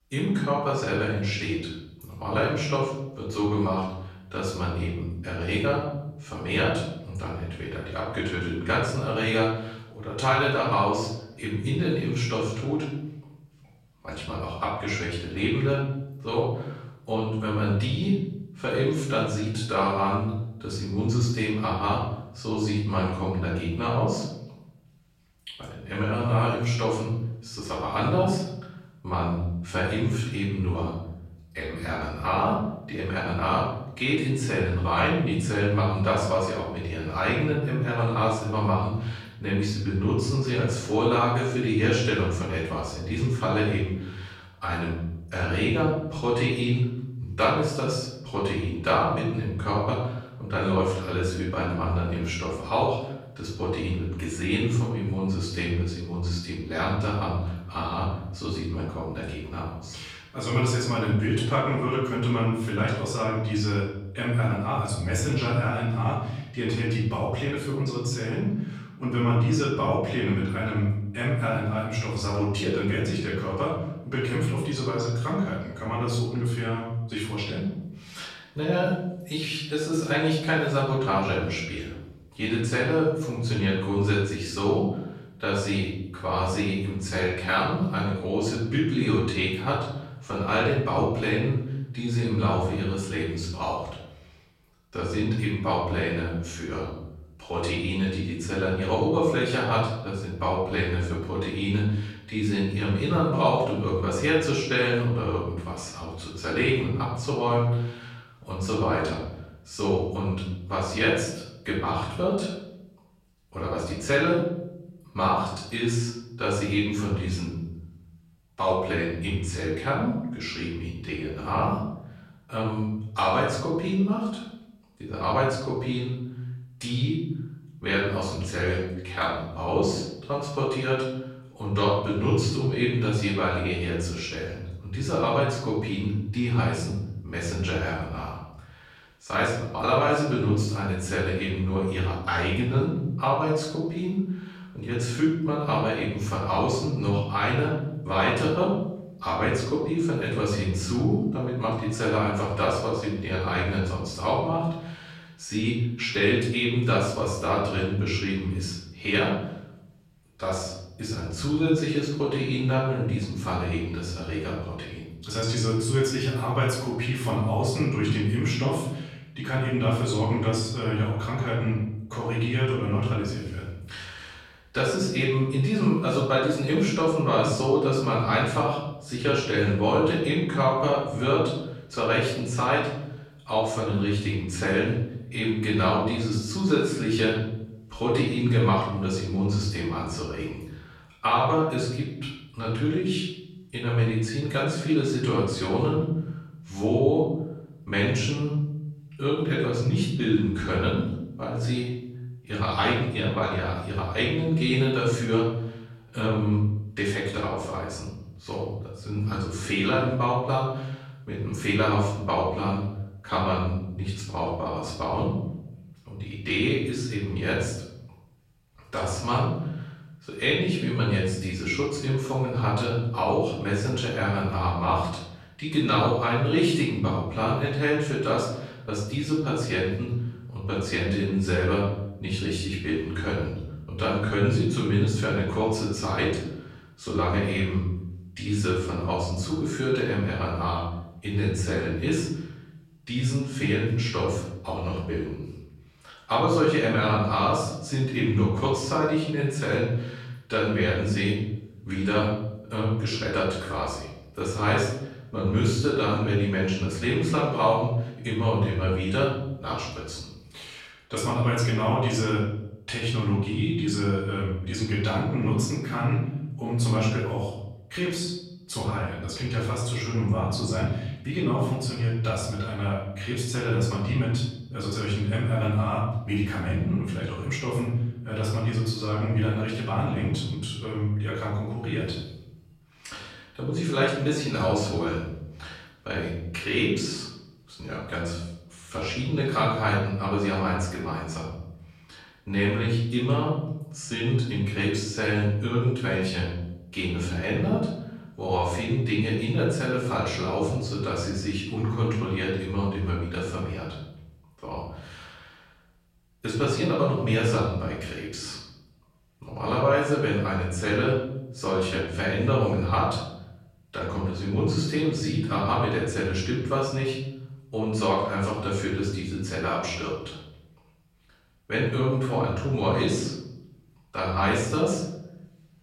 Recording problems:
off-mic speech; far
room echo; noticeable; dies away in 1 s

